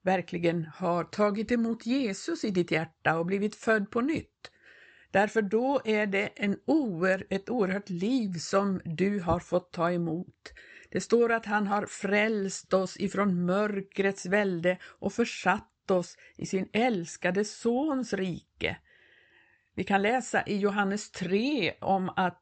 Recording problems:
high frequencies cut off; noticeable; nothing above 8 kHz

